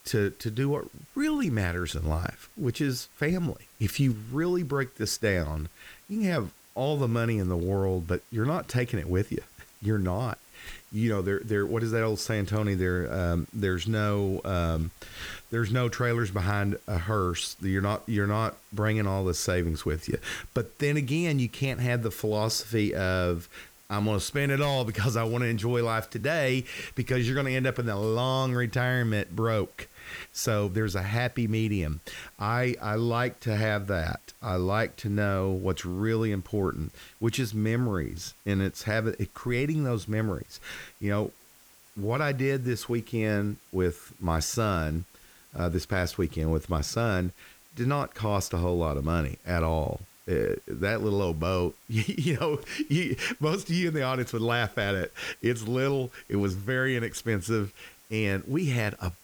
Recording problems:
hiss; faint; throughout; 25 dB below the speech

